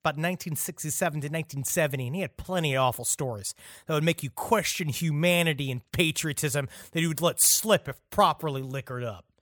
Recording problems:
none

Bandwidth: 18.5 kHz